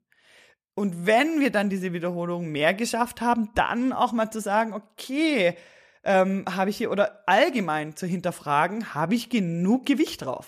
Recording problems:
none

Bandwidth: 14.5 kHz